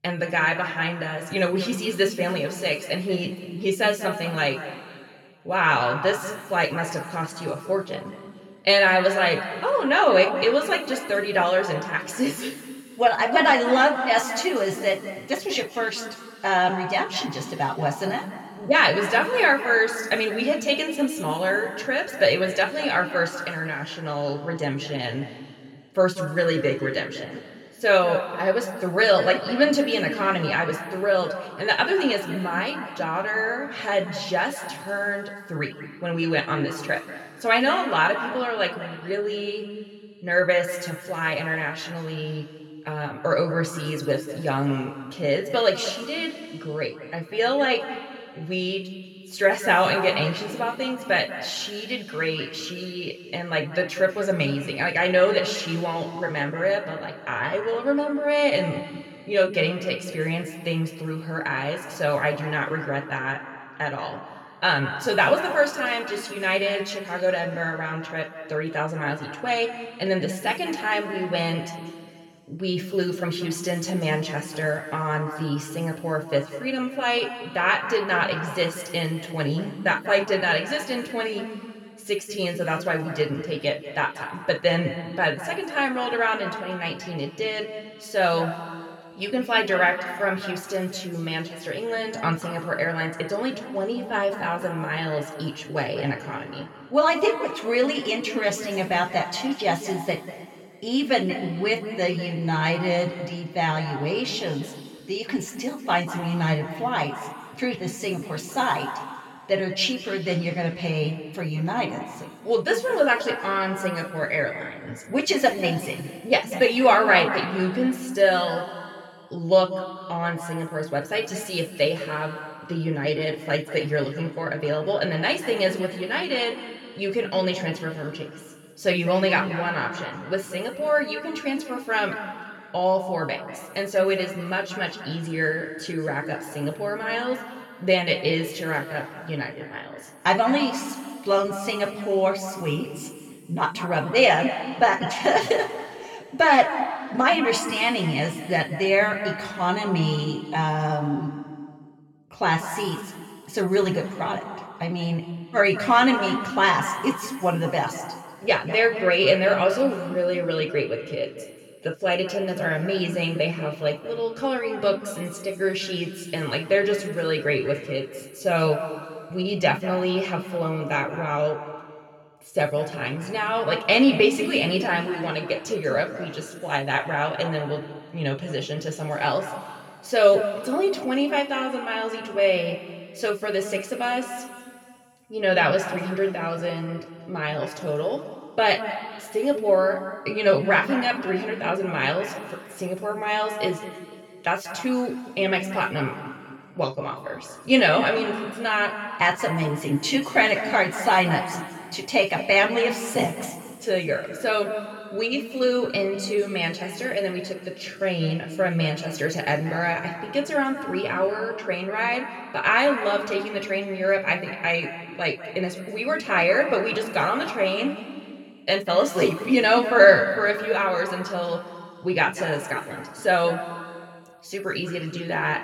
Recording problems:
room echo; noticeable; dies away in 2.3 s
off-mic speech; somewhat distant

